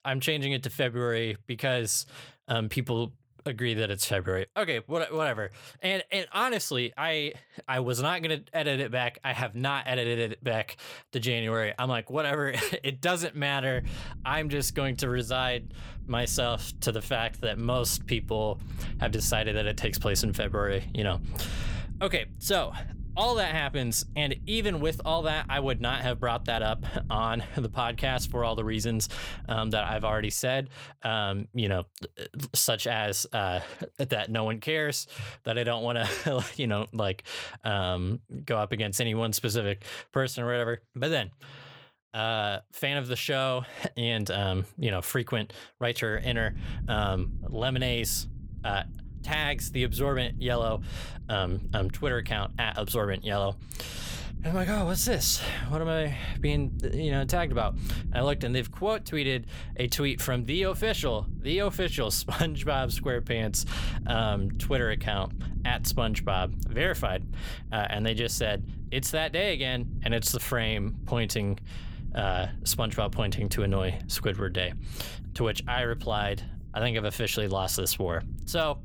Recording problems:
low rumble; faint; from 14 to 30 s and from 46 s on; 20 dB below the speech

